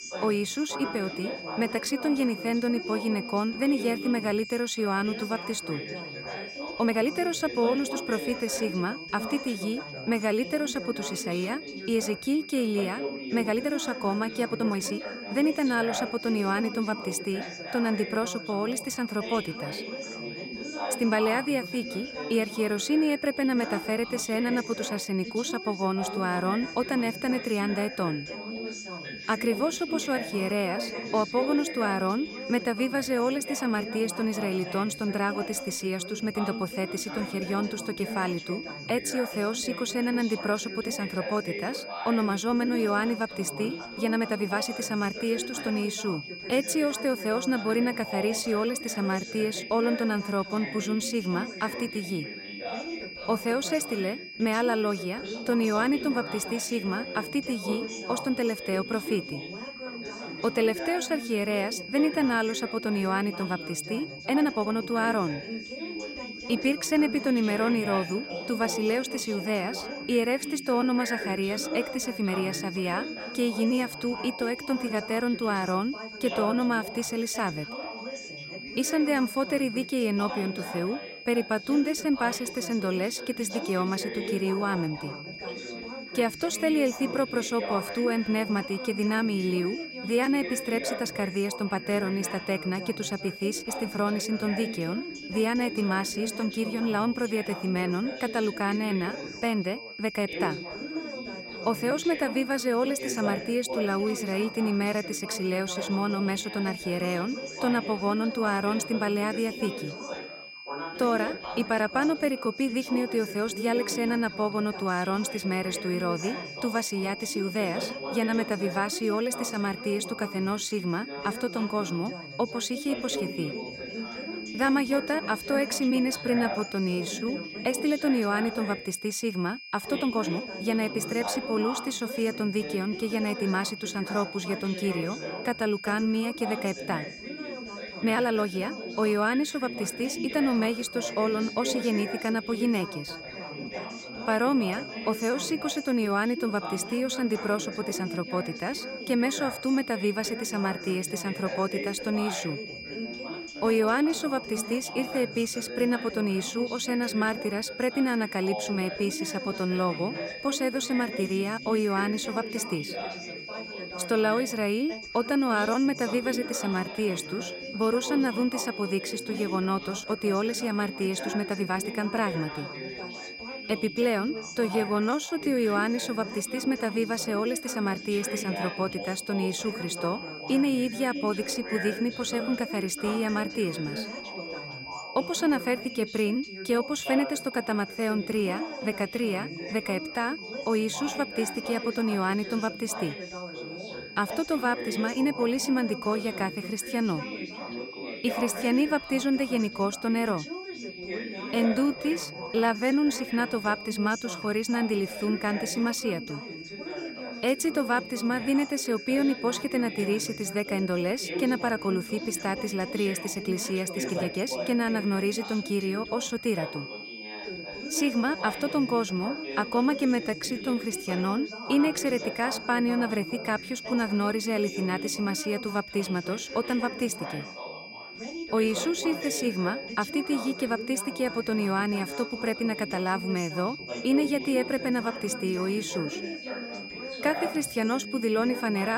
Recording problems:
background chatter; loud; throughout; 3 voices, 10 dB below the speech
high-pitched whine; noticeable; throughout; 2.5 kHz, 10 dB below the speech
uneven, jittery; strongly; from 6.5 s to 3:41
abrupt cut into speech; at the end

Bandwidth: 16 kHz